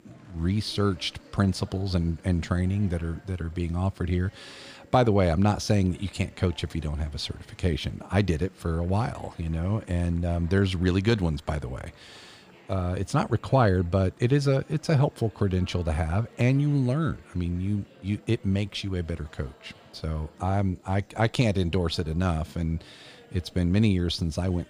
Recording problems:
murmuring crowd; faint; throughout; 25 dB below the speech

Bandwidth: 15 kHz